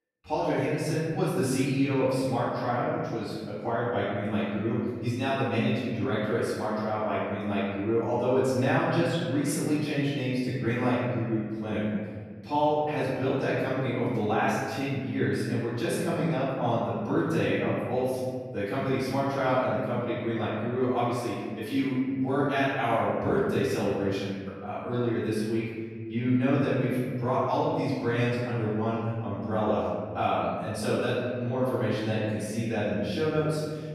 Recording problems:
room echo; strong; dies away in 1.8 s
off-mic speech; far

